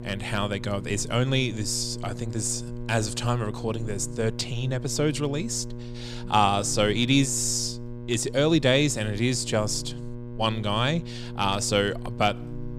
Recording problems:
electrical hum; noticeable; throughout; 60 Hz, 15 dB below the speech

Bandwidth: 15.5 kHz